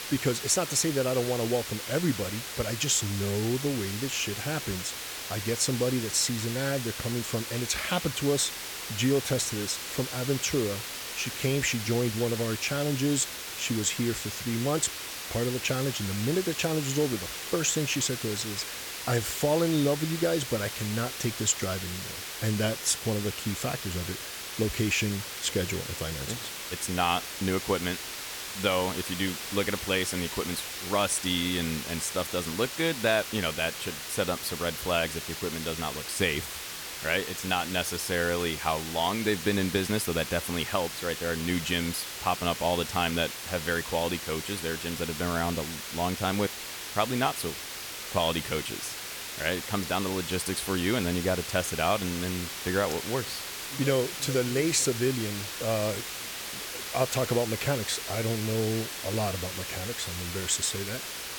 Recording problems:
hiss; loud; throughout; 6 dB below the speech

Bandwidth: 18 kHz